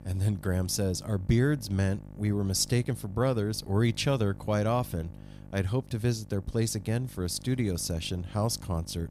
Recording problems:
electrical hum; faint; throughout; 50 Hz, 20 dB below the speech

